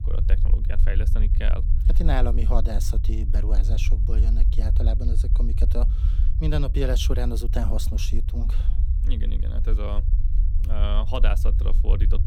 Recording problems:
low rumble; loud; throughout; 10 dB below the speech

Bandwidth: 18.5 kHz